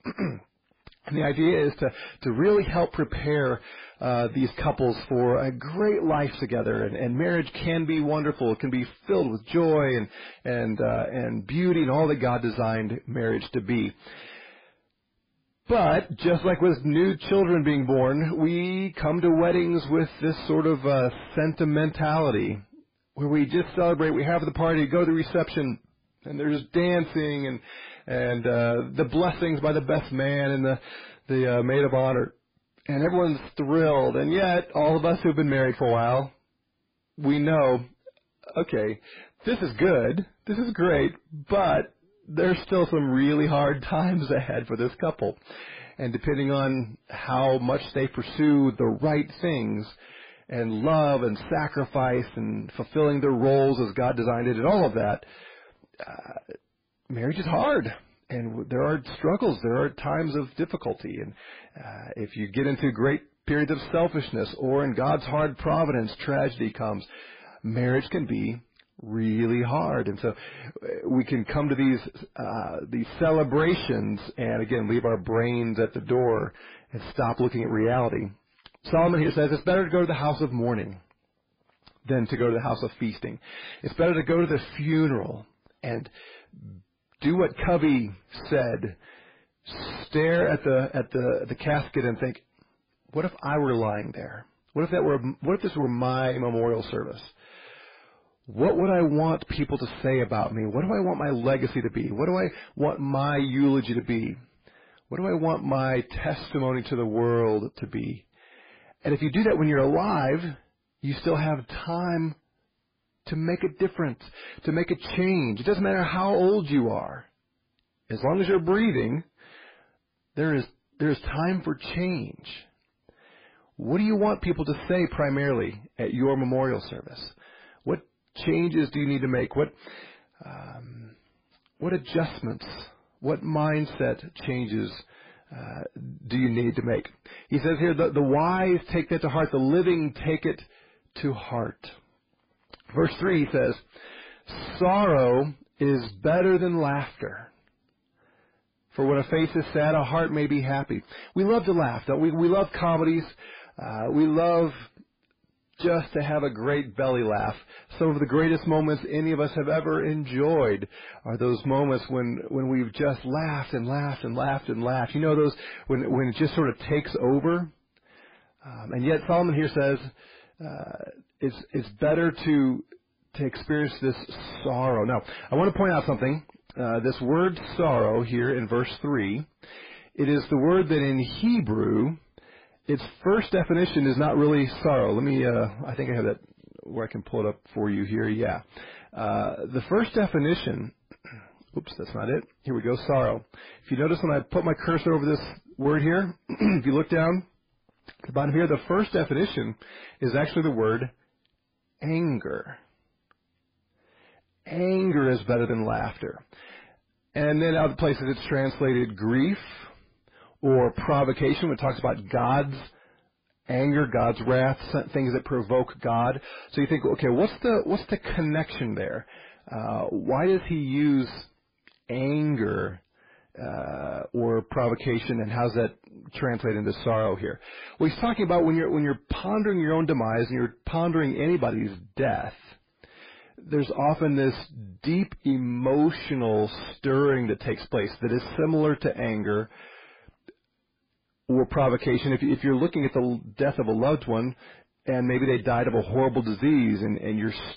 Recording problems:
distortion; heavy; 7 dB below the speech
garbled, watery; badly; nothing above 5 kHz

